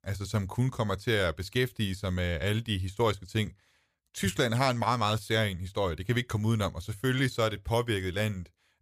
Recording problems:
none

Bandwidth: 15 kHz